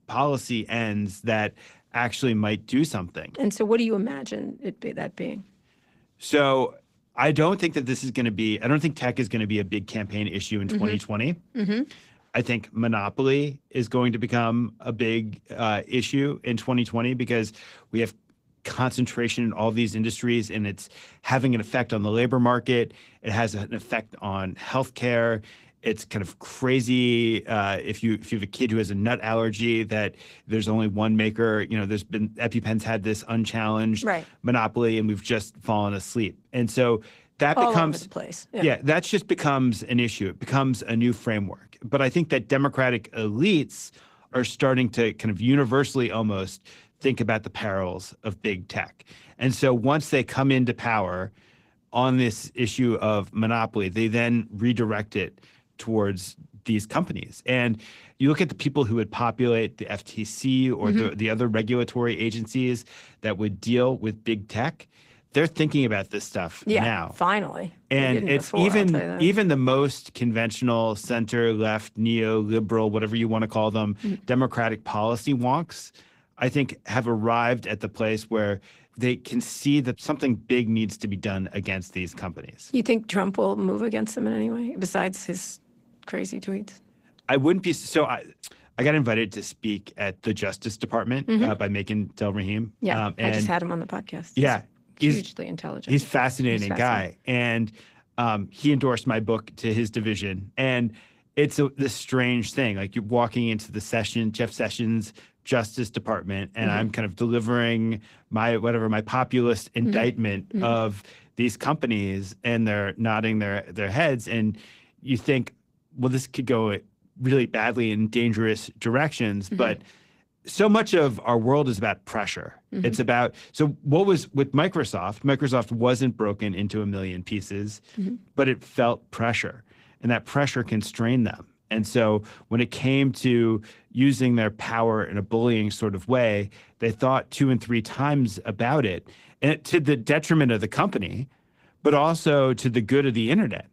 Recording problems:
garbled, watery; slightly; nothing above 15.5 kHz

